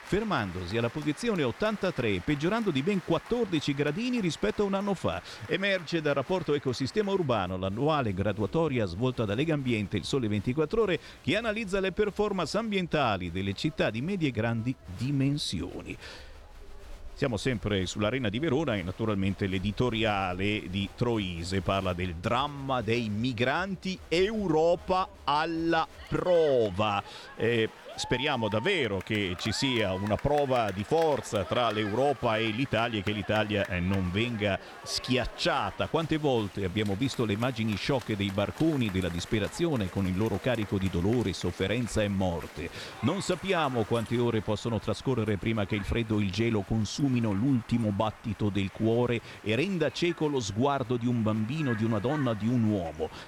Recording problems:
crowd noise; noticeable; throughout; 15 dB below the speech

